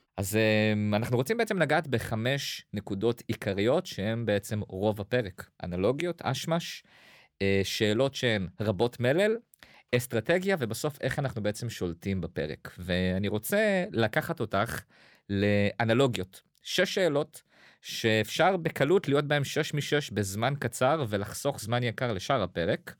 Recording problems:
none

